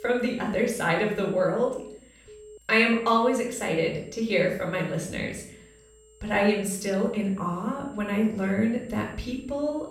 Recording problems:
room echo; noticeable; dies away in 0.5 s
off-mic speech; somewhat distant
high-pitched whine; faint; throughout; 7.5 kHz, 30 dB below the speech
alarms or sirens; faint; throughout; 25 dB below the speech

